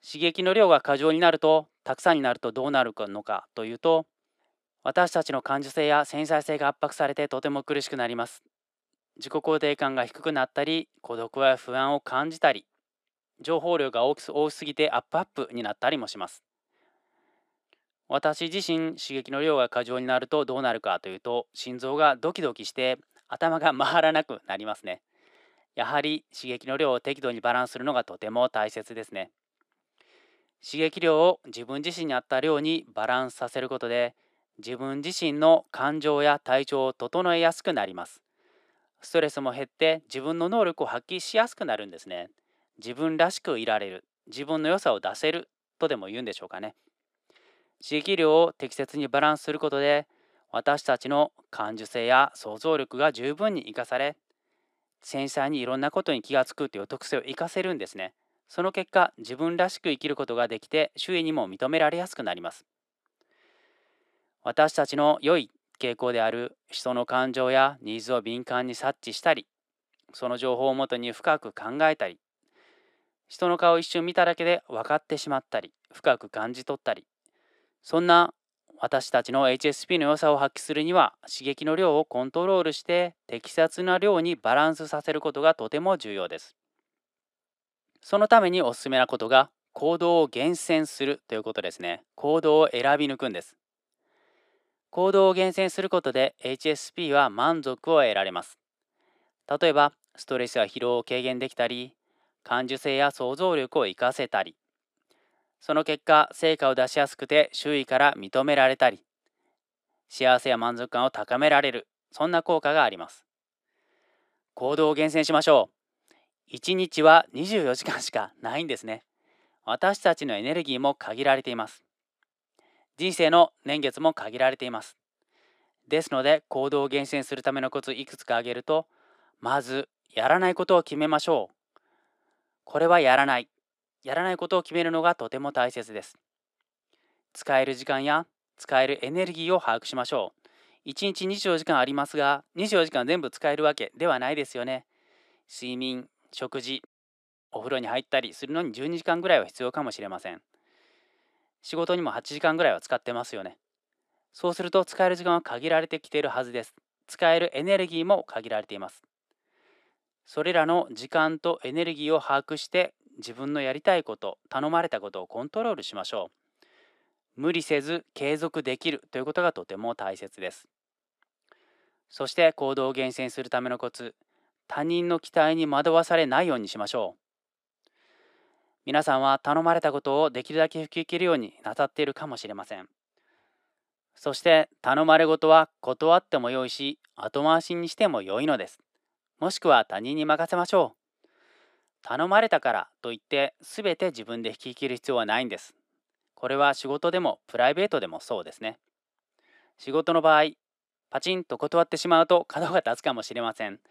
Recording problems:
thin; somewhat; fading below 400 Hz

